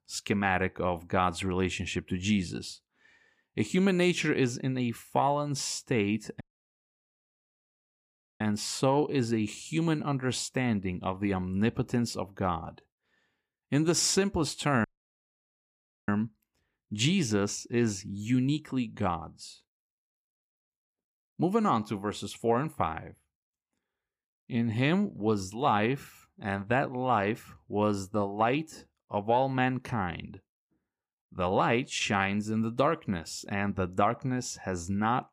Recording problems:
audio cutting out; at 6.5 s for 2 s and at 15 s for 1 s

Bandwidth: 15 kHz